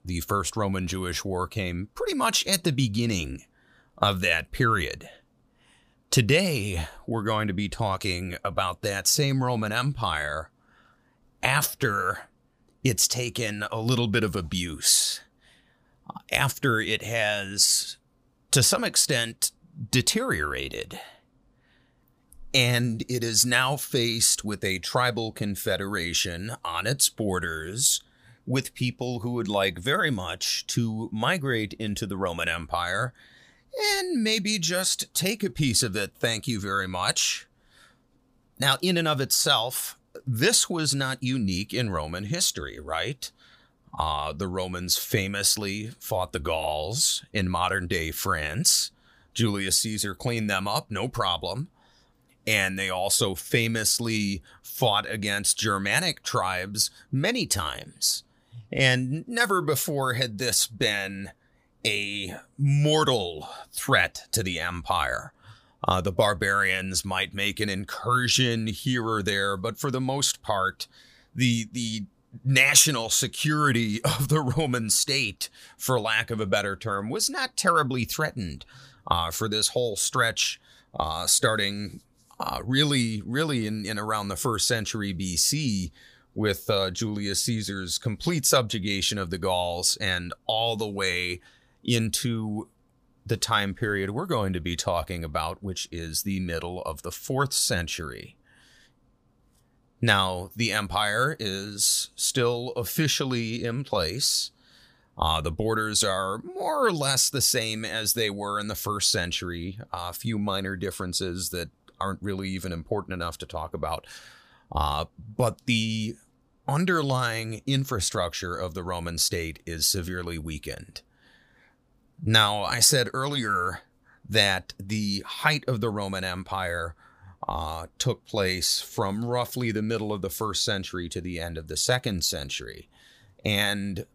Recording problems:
none

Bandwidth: 15 kHz